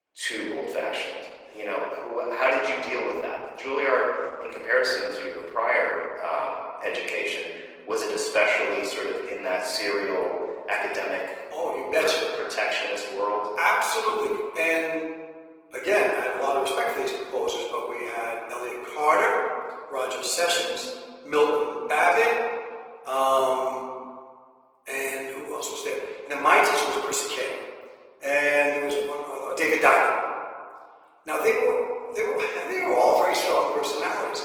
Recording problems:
off-mic speech; far
thin; very; fading below 400 Hz
room echo; noticeable; dies away in 1.5 s
garbled, watery; slightly; nothing above 19.5 kHz

